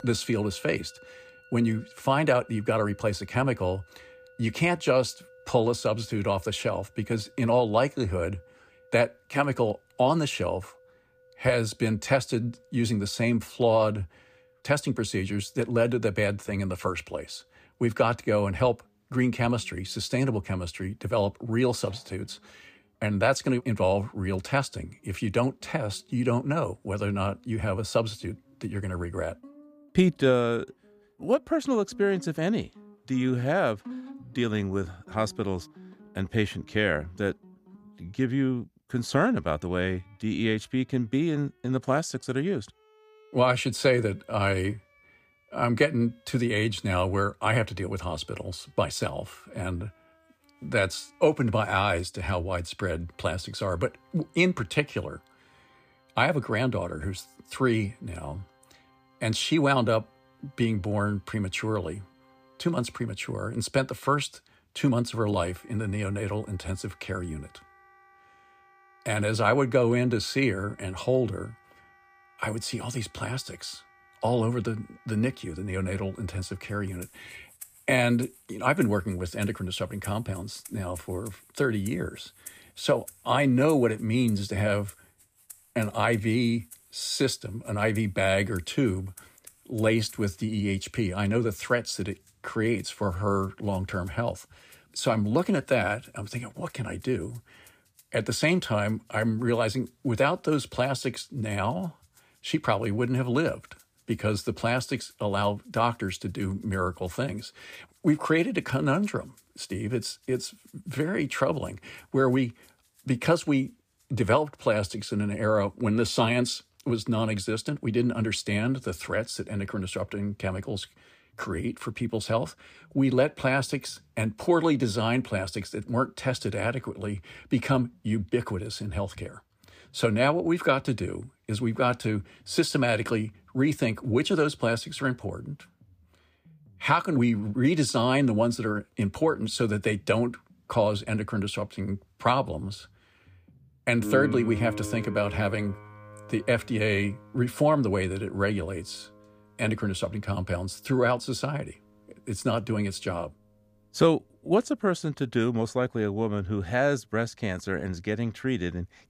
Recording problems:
background music; faint; throughout; 20 dB below the speech

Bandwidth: 15 kHz